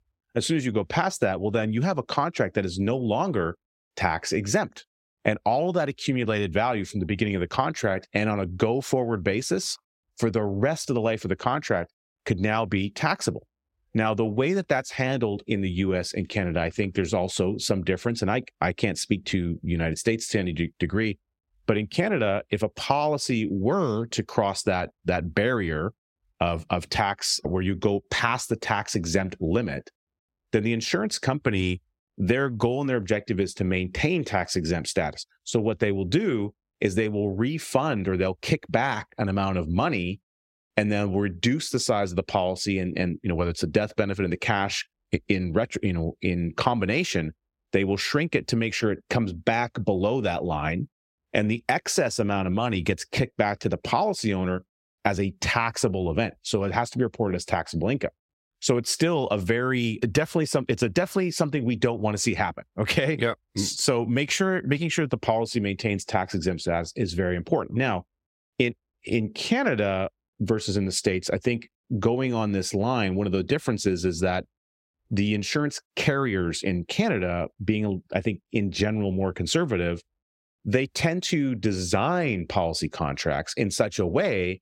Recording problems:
squashed, flat; somewhat

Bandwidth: 16 kHz